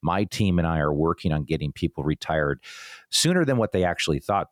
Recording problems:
none

